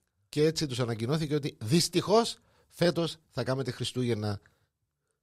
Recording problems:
none

